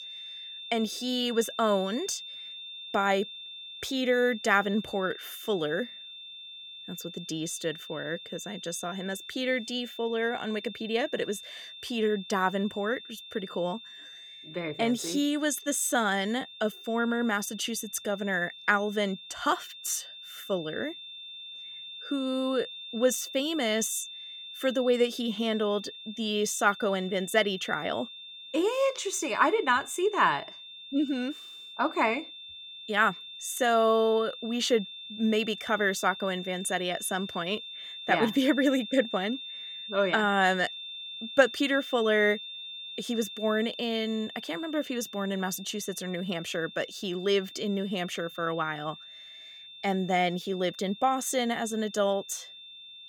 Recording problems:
high-pitched whine; noticeable; throughout; 3.5 kHz, 10 dB below the speech

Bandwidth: 17.5 kHz